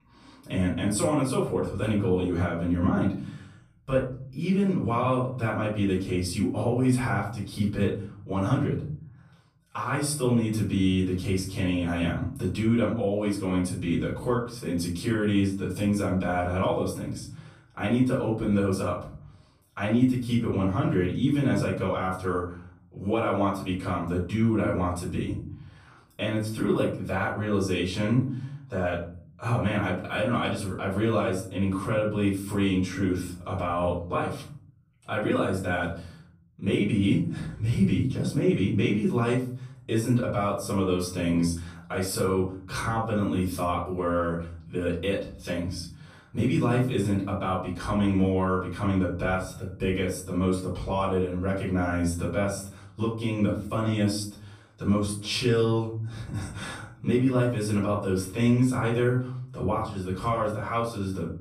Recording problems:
off-mic speech; far
room echo; noticeable; dies away in 0.9 s

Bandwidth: 15 kHz